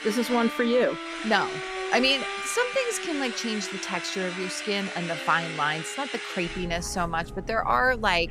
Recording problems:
machinery noise; loud; throughout; 9 dB below the speech
background music; noticeable; throughout; 10 dB below the speech
voice in the background; faint; throughout; 25 dB below the speech

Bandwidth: 14.5 kHz